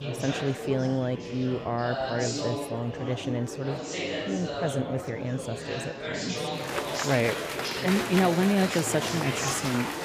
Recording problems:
murmuring crowd; loud; throughout; 3 dB below the speech

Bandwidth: 15 kHz